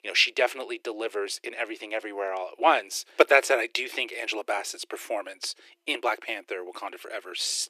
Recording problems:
thin; very; fading below 350 Hz

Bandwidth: 14.5 kHz